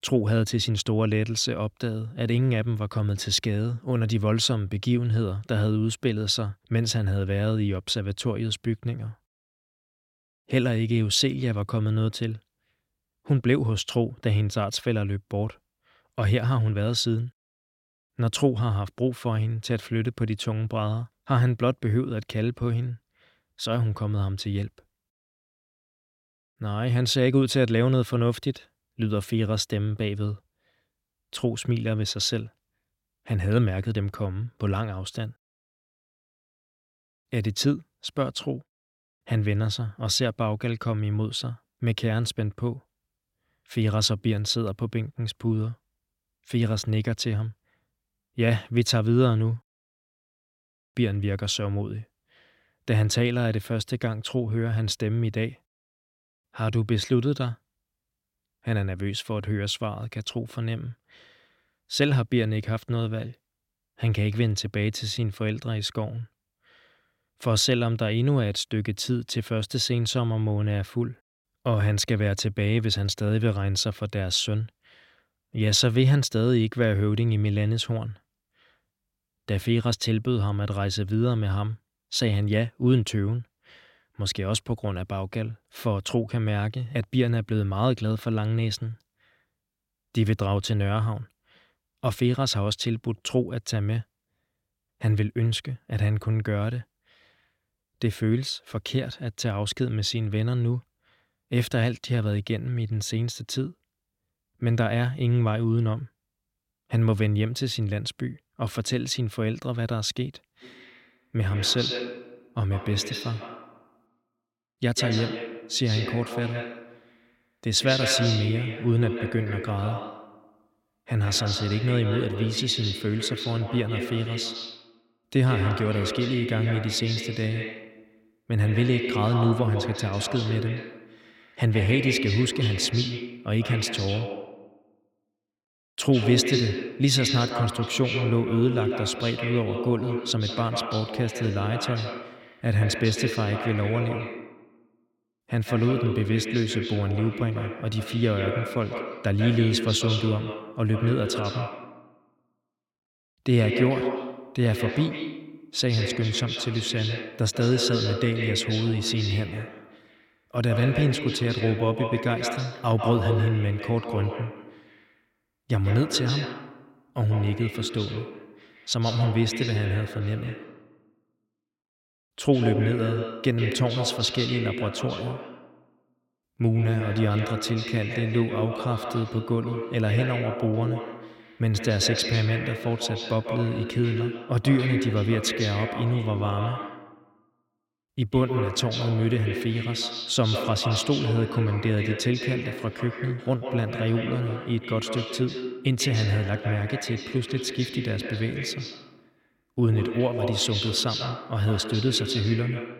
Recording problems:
echo of what is said; strong; from 1:51 on; 140 ms later, 6 dB below the speech

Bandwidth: 16.5 kHz